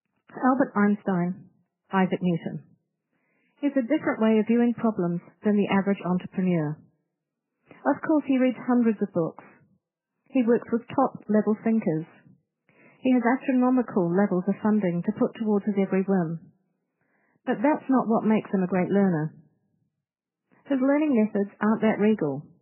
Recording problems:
garbled, watery; badly; nothing above 3 kHz

